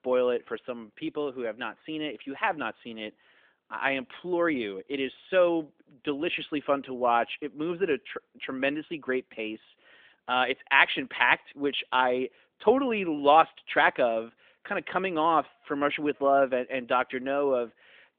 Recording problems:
phone-call audio; nothing above 3.5 kHz

